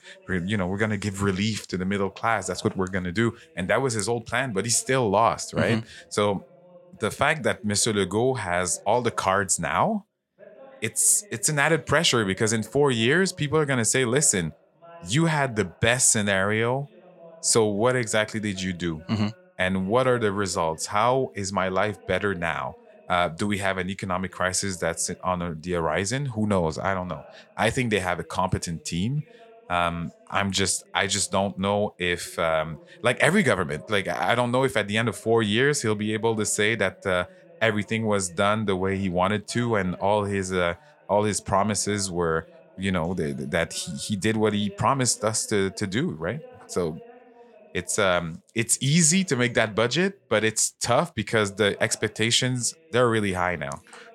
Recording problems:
voice in the background; faint; throughout; 25 dB below the speech

